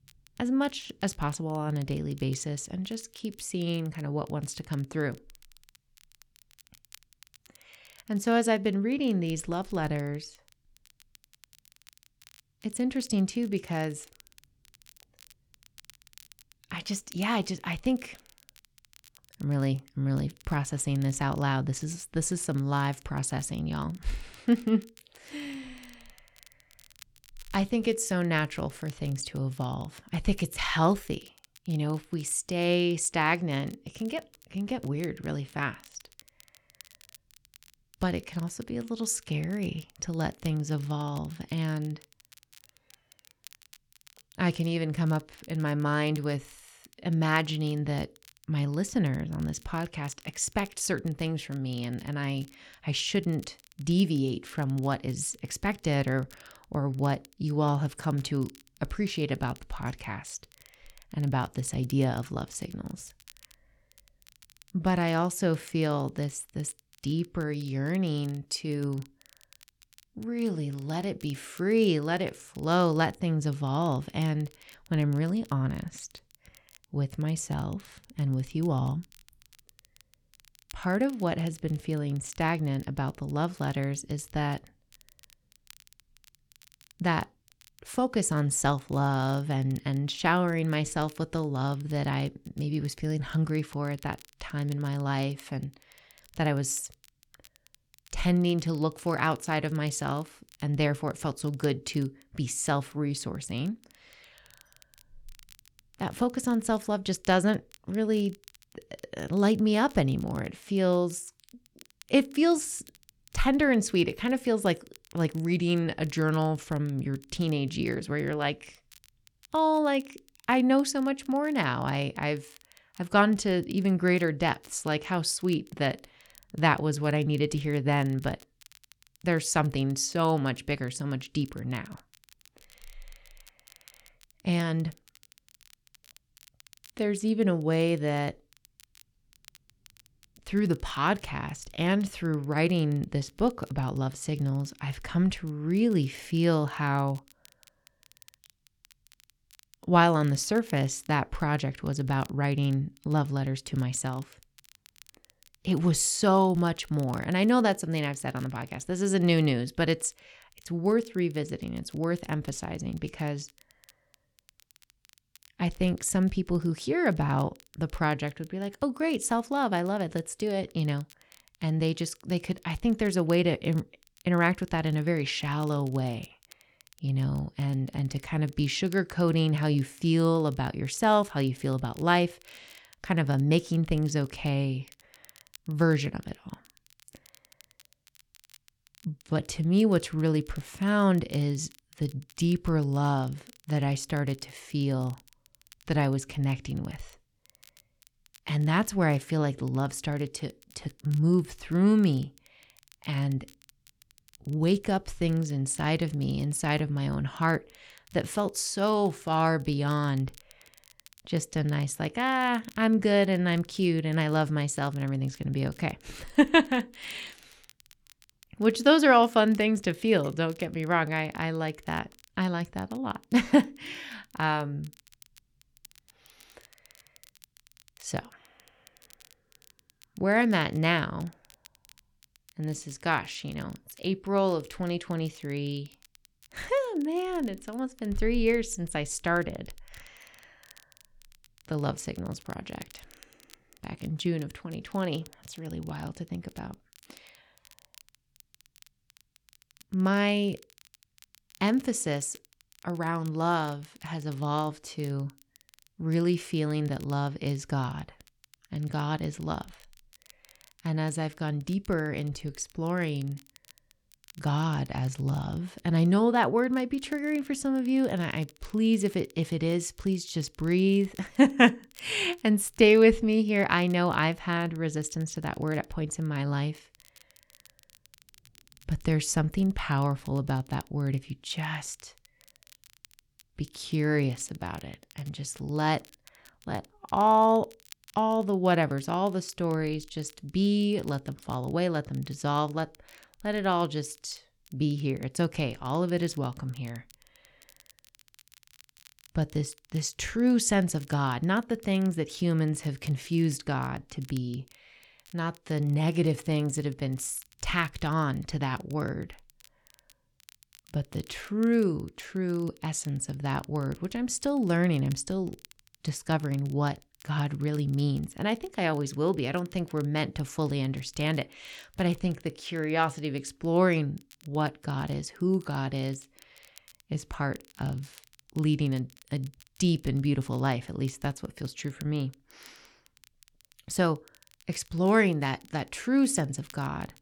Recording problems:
crackle, like an old record; faint; 30 dB below the speech

